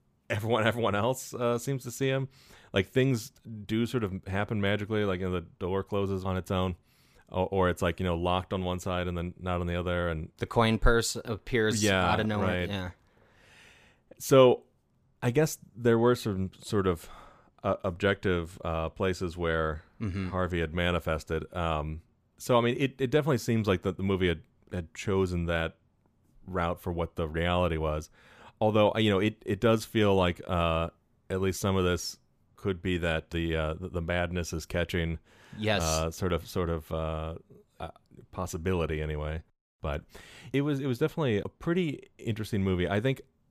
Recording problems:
none

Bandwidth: 15 kHz